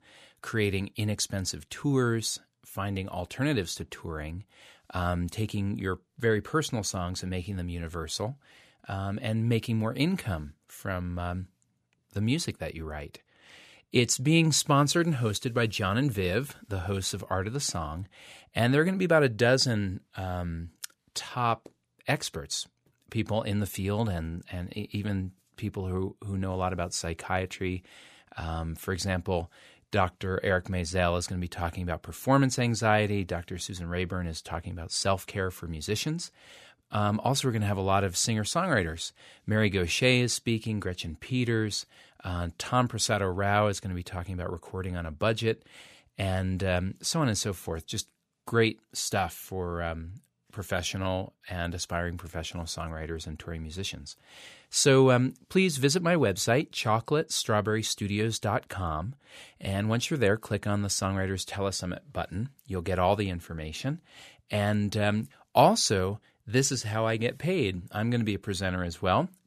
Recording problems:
none

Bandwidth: 14.5 kHz